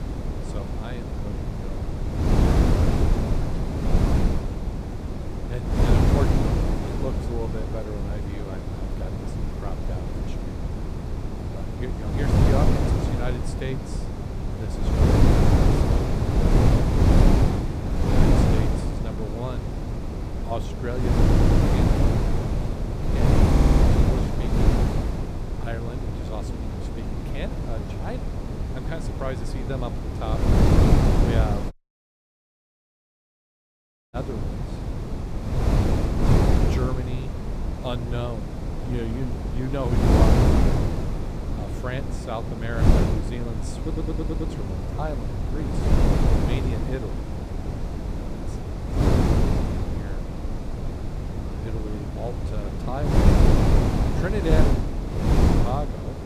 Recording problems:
wind noise on the microphone; heavy; 5 dB above the speech
audio stuttering; at 21 s, at 24 s and at 44 s
audio cutting out; at 32 s for 2.5 s

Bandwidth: 15 kHz